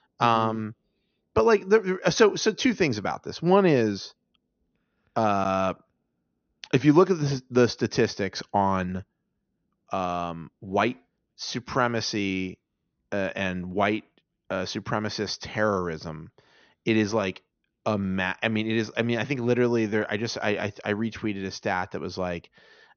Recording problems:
high frequencies cut off; noticeable; nothing above 6.5 kHz

